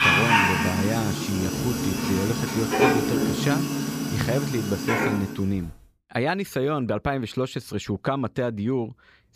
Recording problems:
animal sounds; very loud; until 5 s; 3 dB above the speech

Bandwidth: 15 kHz